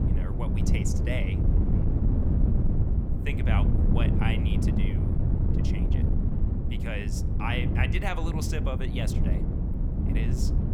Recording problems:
wind noise on the microphone; heavy; 2 dB below the speech

